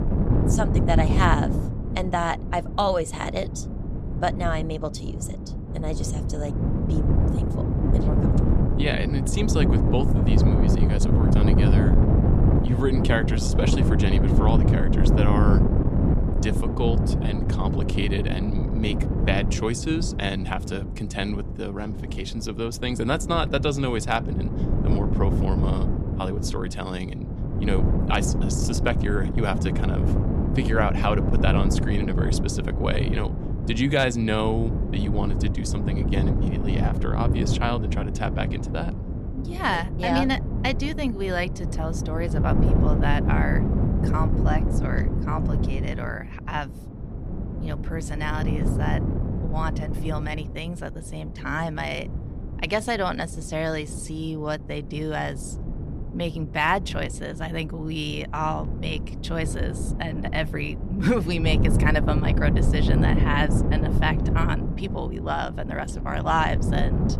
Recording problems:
wind noise on the microphone; heavy; 5 dB below the speech

